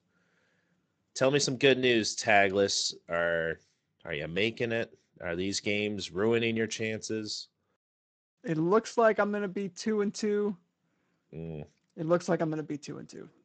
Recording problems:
garbled, watery; slightly; nothing above 7.5 kHz

